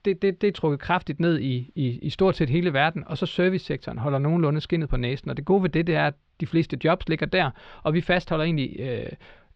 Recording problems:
muffled; slightly; fading above 4 kHz

